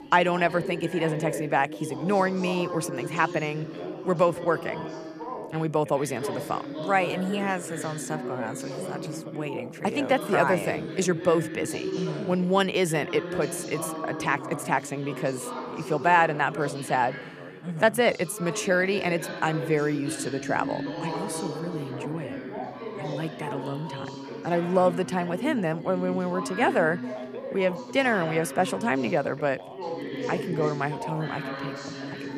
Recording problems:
background chatter; loud; throughout; 3 voices, 8 dB below the speech

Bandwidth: 14.5 kHz